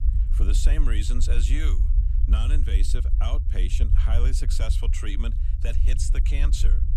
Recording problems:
low rumble; loud; throughout; 8 dB below the speech

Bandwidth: 14.5 kHz